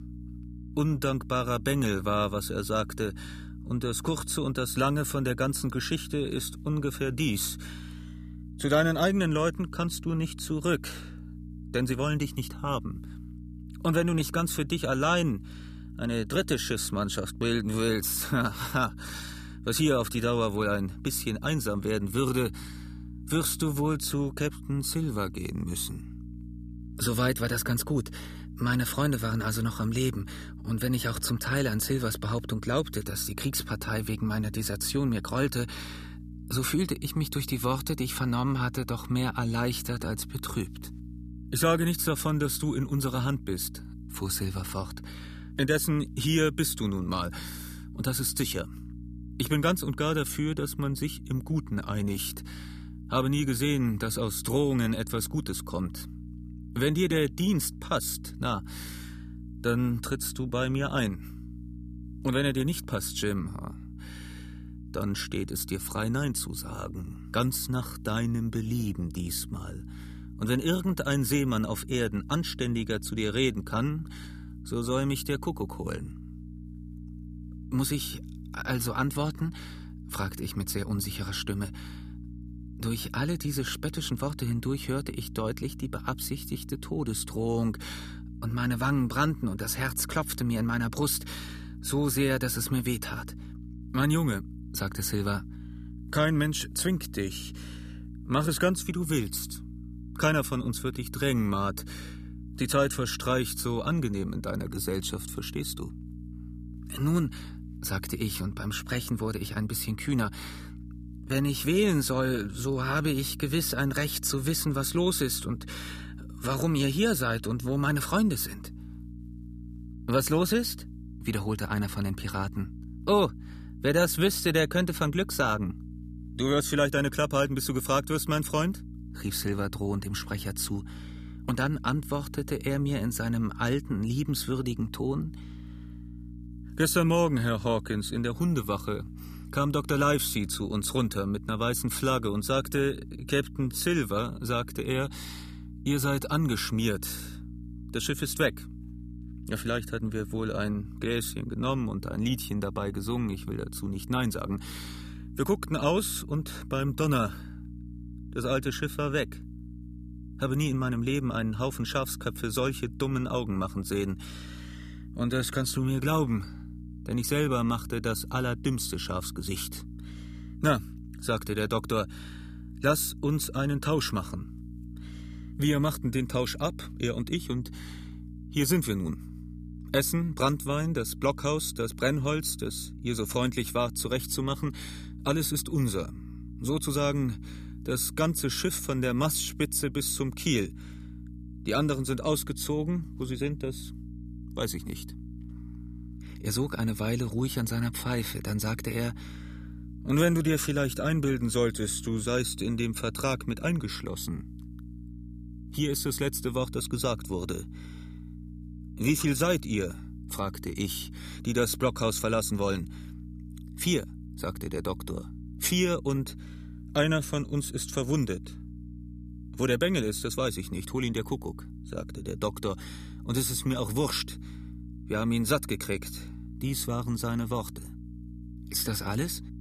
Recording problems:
electrical hum; faint; throughout; 60 Hz, 20 dB below the speech

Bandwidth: 14.5 kHz